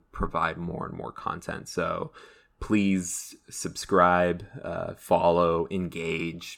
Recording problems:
none

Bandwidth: 17 kHz